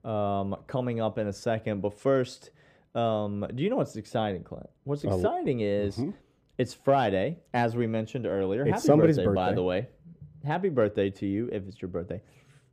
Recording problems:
muffled; slightly; fading above 1 kHz

